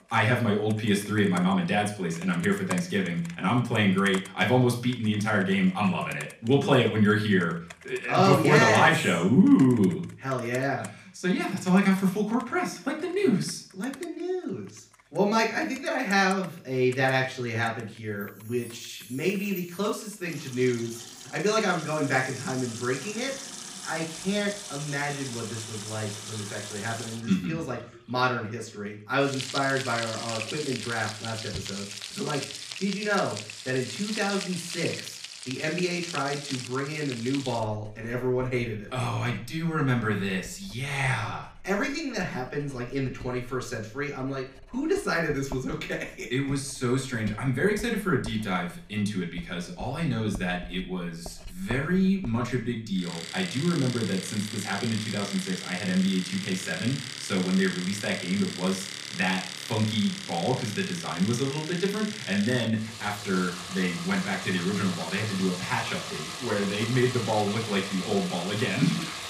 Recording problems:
room echo; slight; dies away in 0.4 s
off-mic speech; somewhat distant
household noises; loud; throughout; 10 dB below the speech

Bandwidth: 15 kHz